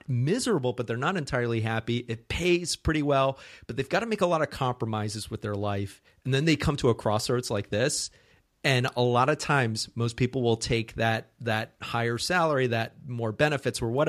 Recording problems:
abrupt cut into speech; at the end

